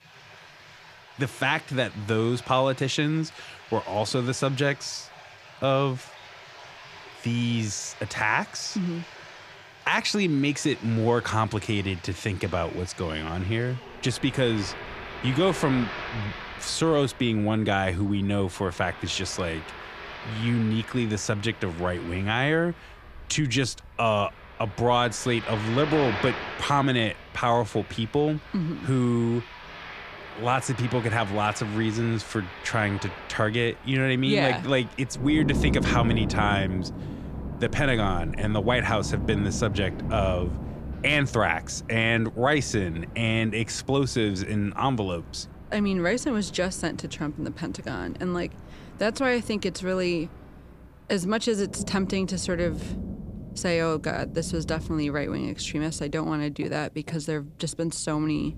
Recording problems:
rain or running water; noticeable; throughout; 10 dB below the speech

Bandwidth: 15 kHz